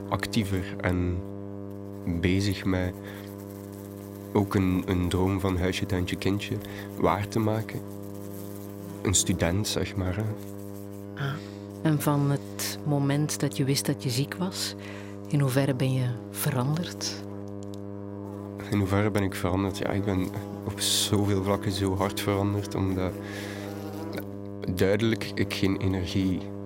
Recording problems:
electrical hum; noticeable; throughout; 50 Hz, 10 dB below the speech

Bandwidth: 16 kHz